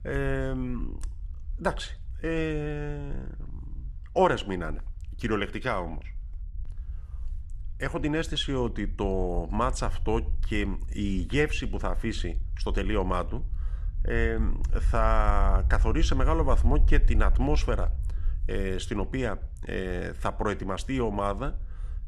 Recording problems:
low rumble; faint; throughout; 25 dB below the speech

